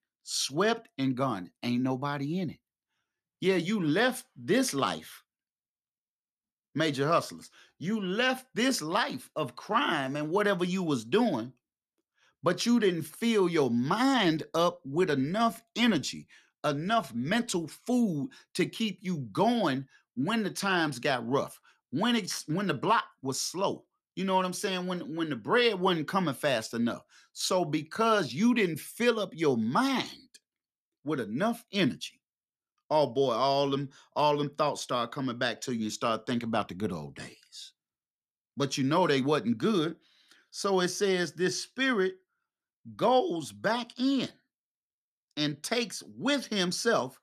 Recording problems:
none

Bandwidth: 14 kHz